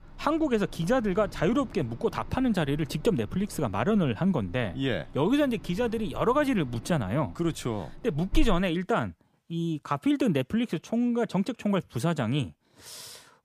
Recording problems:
wind in the background; noticeable; until 8.5 s; 15 dB below the speech

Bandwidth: 15 kHz